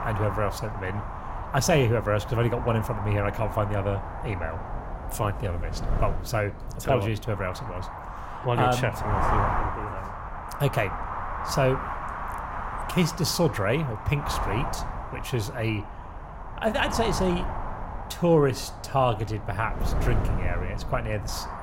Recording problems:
wind noise on the microphone; heavy; 5 dB below the speech

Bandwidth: 16 kHz